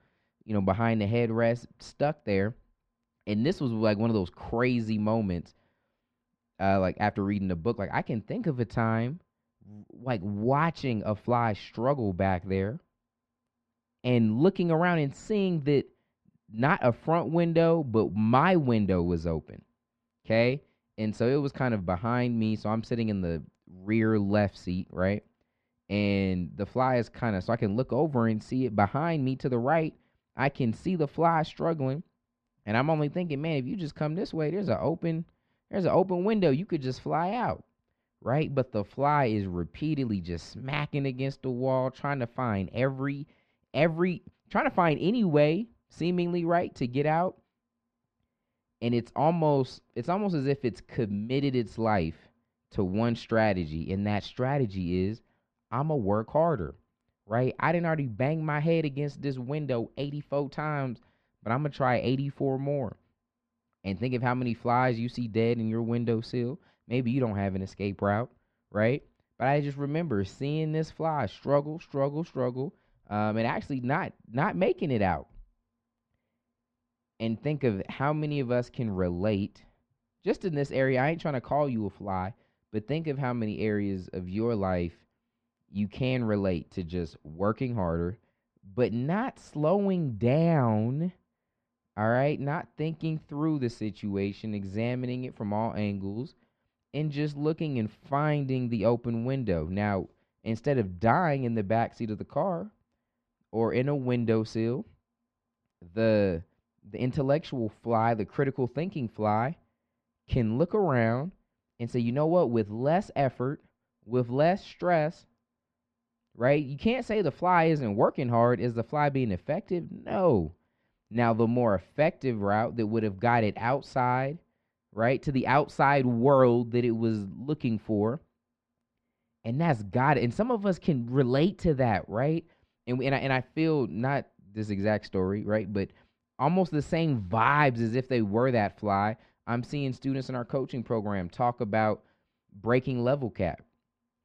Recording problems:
muffled; very; fading above 2 kHz

